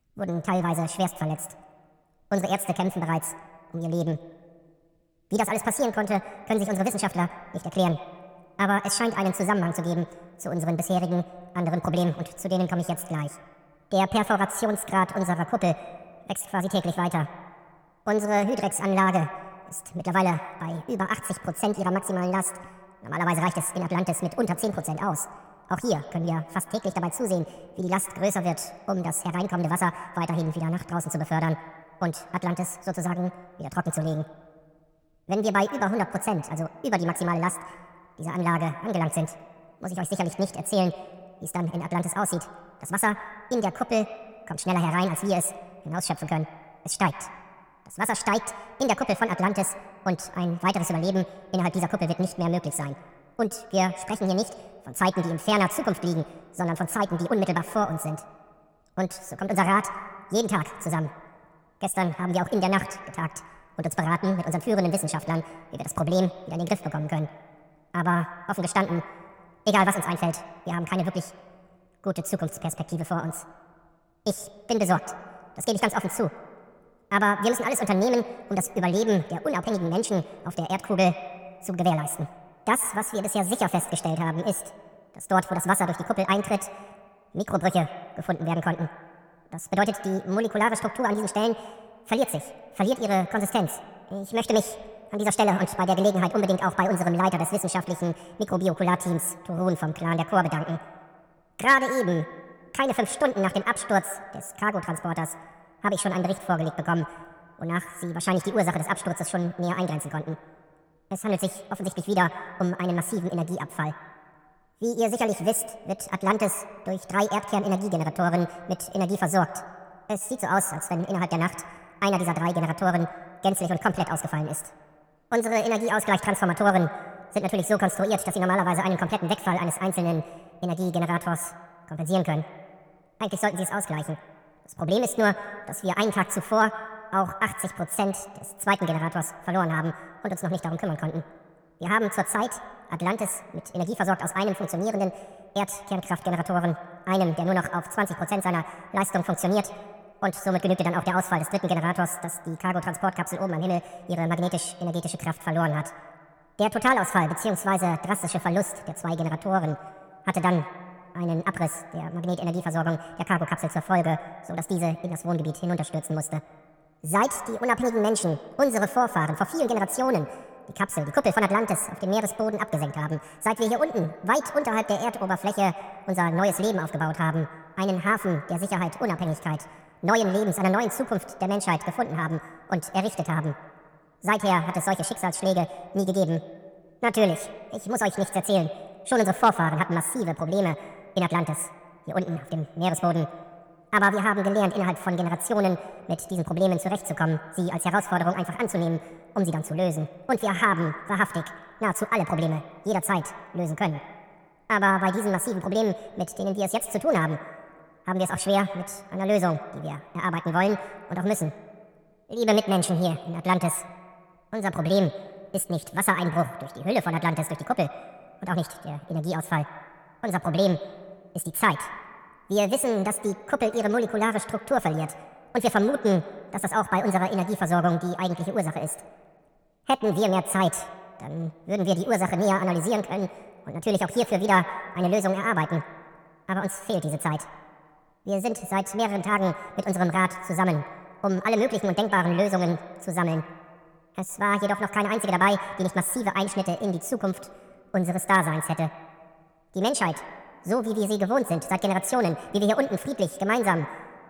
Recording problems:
wrong speed and pitch; too fast and too high; 1.7 times normal speed
echo of what is said; noticeable; throughout; 110 ms later, 15 dB below the speech

